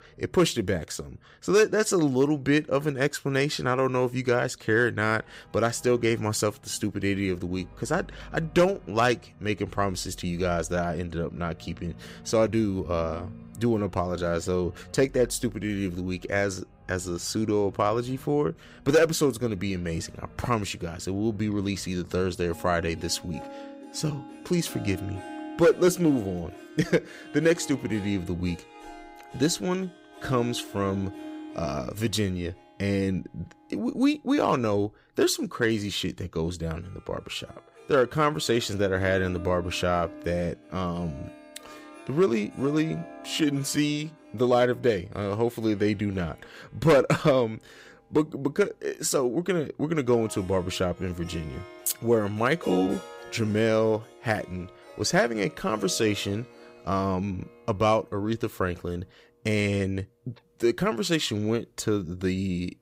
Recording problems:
background music; noticeable; throughout; 20 dB below the speech

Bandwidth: 15.5 kHz